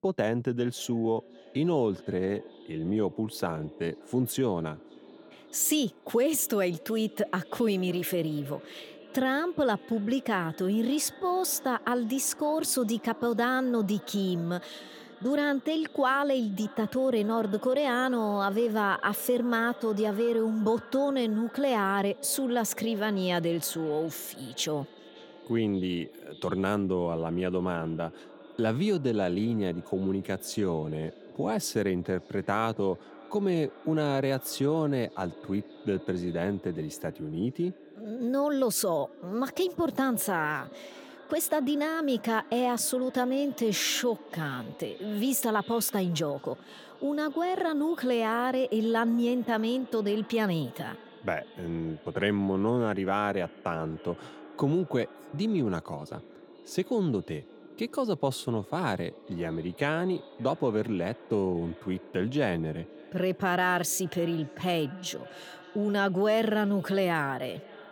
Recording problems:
echo of what is said; faint; throughout; 570 ms later, 20 dB below the speech

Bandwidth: 17.5 kHz